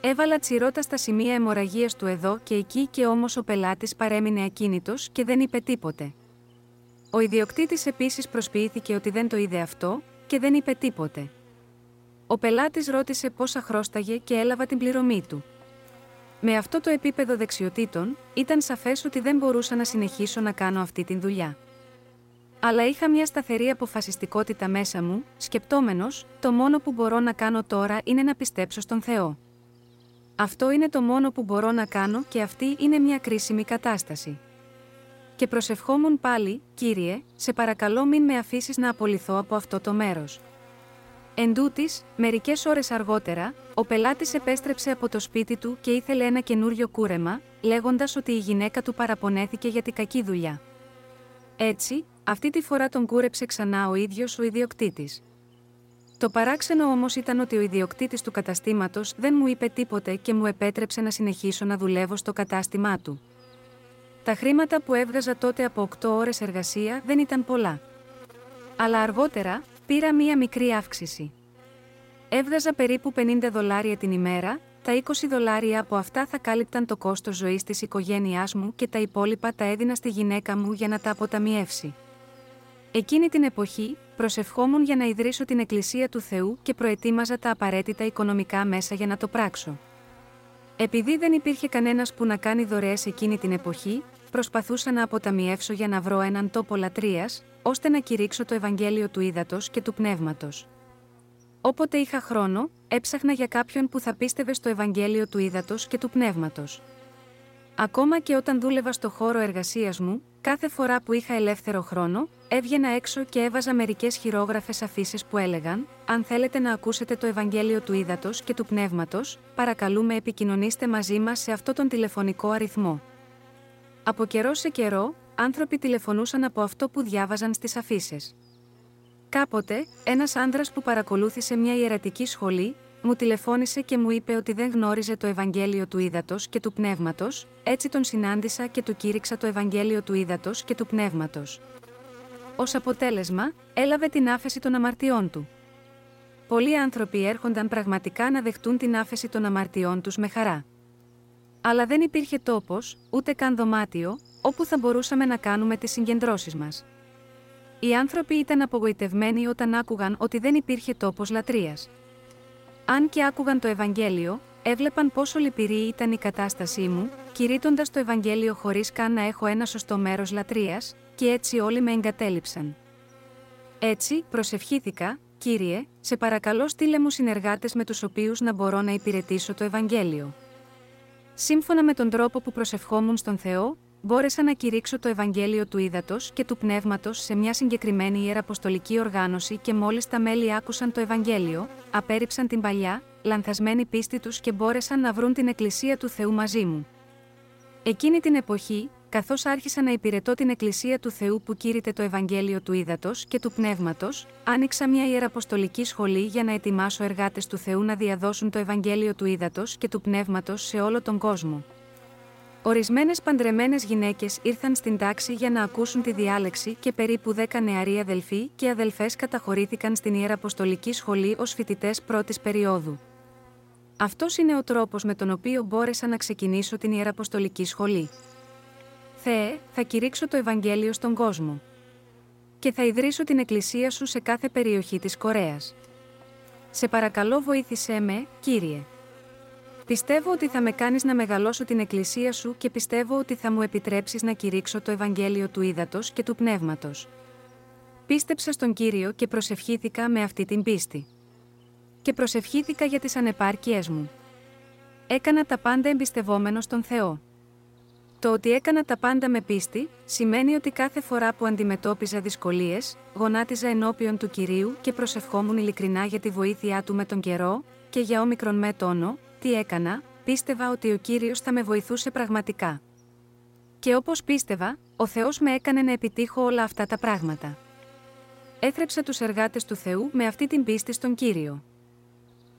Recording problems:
electrical hum; faint; throughout; 60 Hz, 25 dB below the speech

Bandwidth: 16 kHz